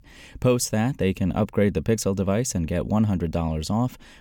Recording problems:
none

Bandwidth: 18 kHz